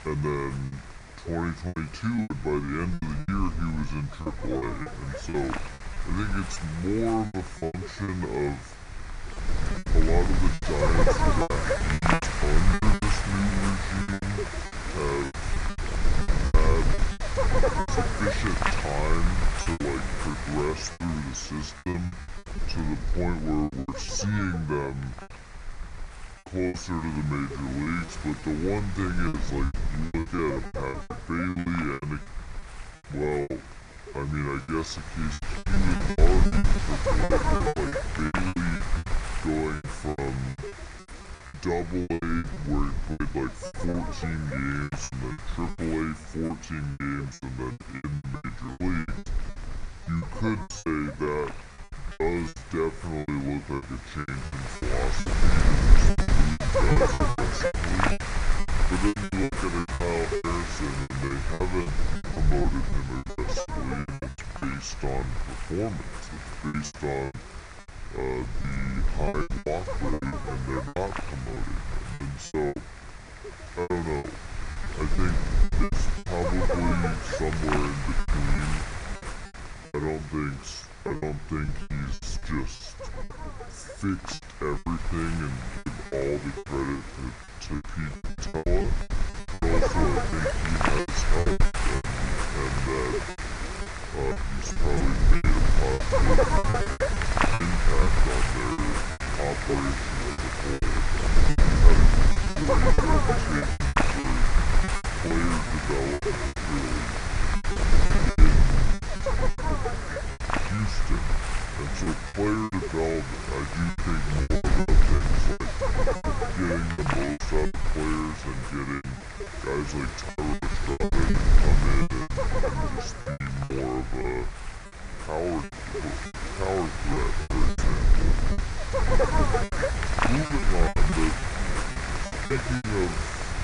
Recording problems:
wrong speed and pitch; too slow and too low; 0.7 times normal speed
wind noise on the microphone; heavy; 2 dB above the speech
choppy; very; 15% of the speech affected

